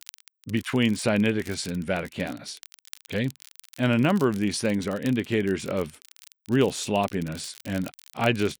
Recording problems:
crackle, like an old record; faint; 20 dB below the speech

